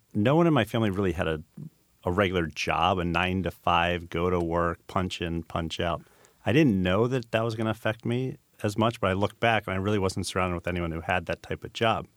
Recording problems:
none

